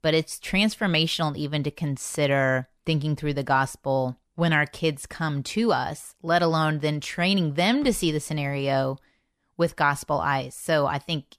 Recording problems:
none

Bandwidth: 14.5 kHz